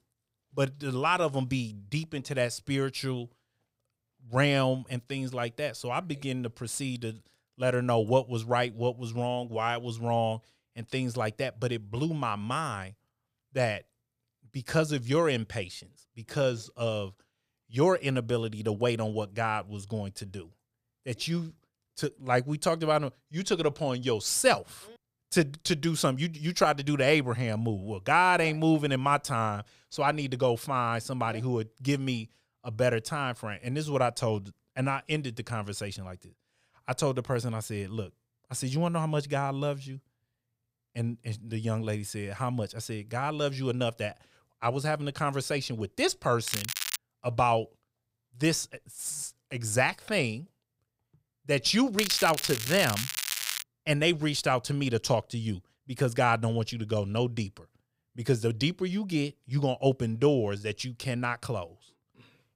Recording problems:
crackling; loud; at 46 s and from 52 to 54 s; 3 dB below the speech

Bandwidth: 15.5 kHz